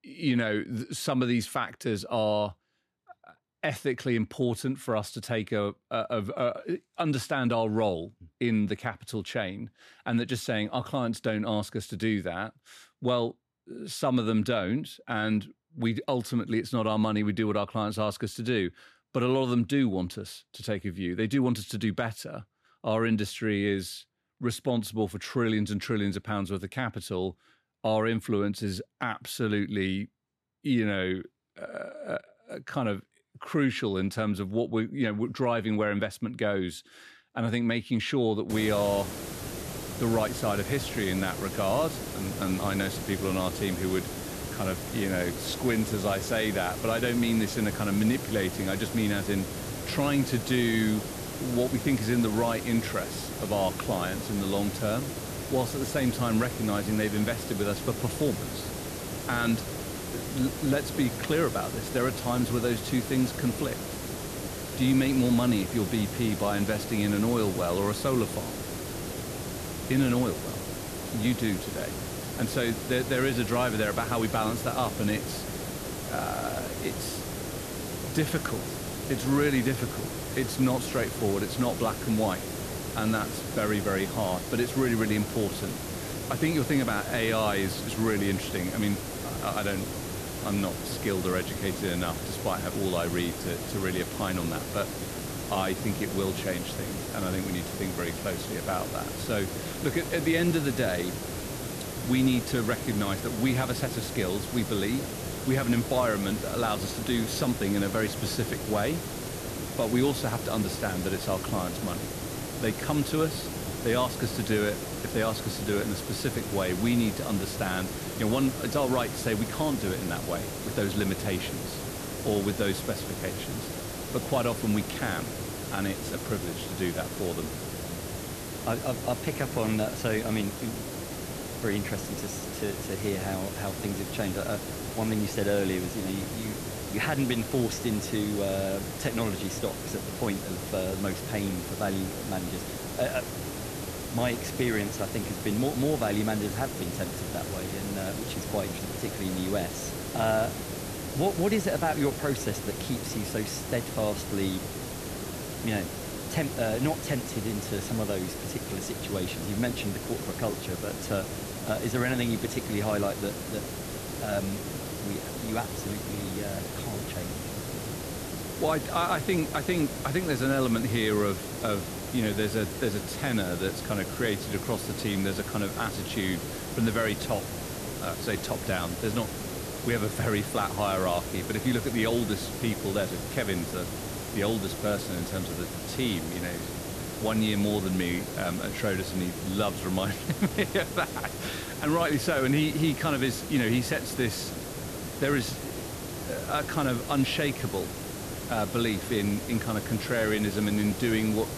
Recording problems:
hiss; loud; from 39 s on; 5 dB below the speech

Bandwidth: 14 kHz